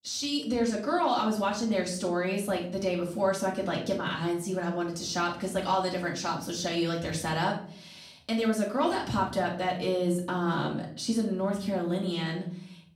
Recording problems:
off-mic speech; far
room echo; slight; dies away in 0.4 s

